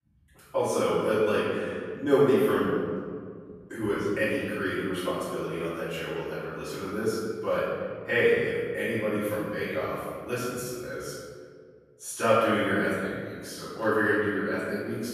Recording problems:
room echo; strong; dies away in 1.8 s
off-mic speech; far

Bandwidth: 14.5 kHz